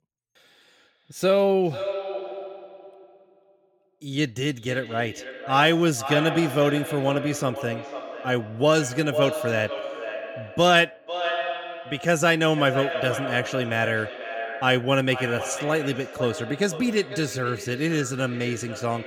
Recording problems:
echo of what is said; strong; throughout; 500 ms later, 9 dB below the speech

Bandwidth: 17 kHz